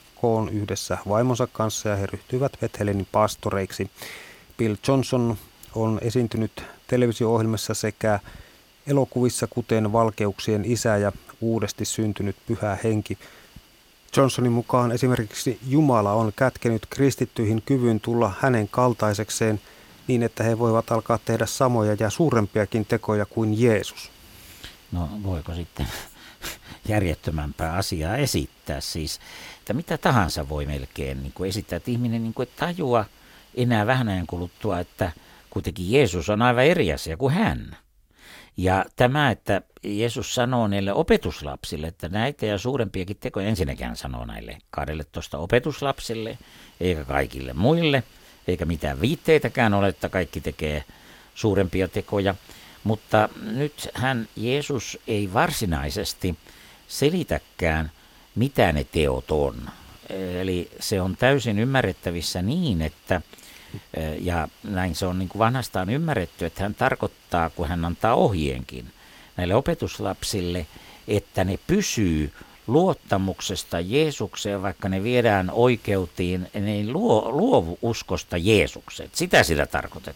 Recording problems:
hiss; faint; until 36 s and from 46 s on; 25 dB below the speech

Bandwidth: 16.5 kHz